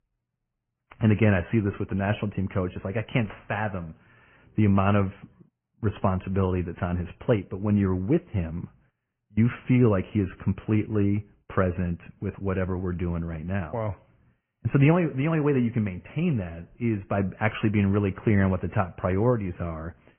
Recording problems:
high frequencies cut off; severe; nothing above 3 kHz
garbled, watery; slightly

